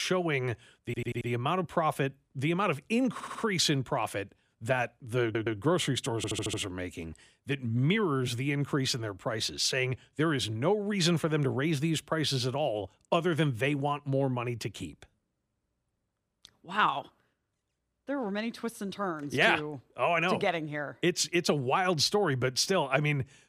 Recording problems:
abrupt cut into speech; at the start
audio stuttering; 4 times, first at 1 s

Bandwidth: 15 kHz